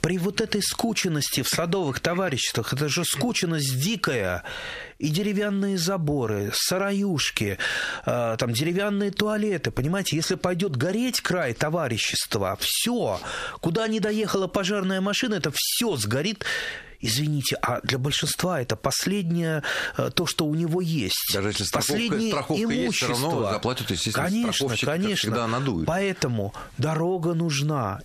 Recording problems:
squashed, flat; heavily

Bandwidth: 14.5 kHz